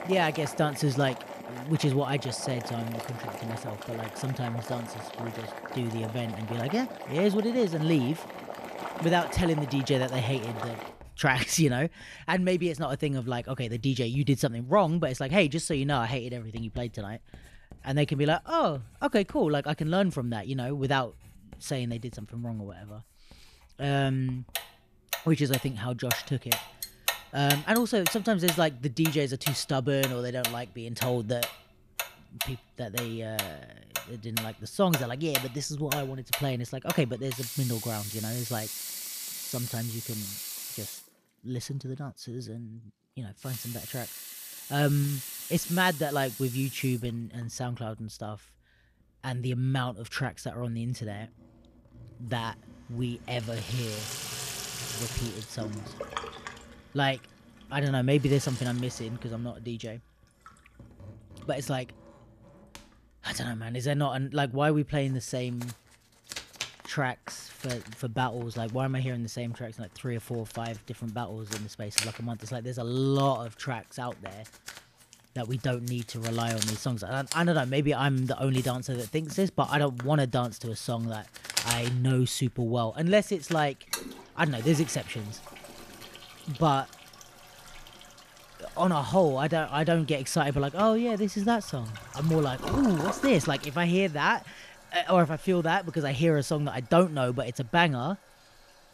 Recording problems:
household noises; loud; throughout; 8 dB below the speech

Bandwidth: 14.5 kHz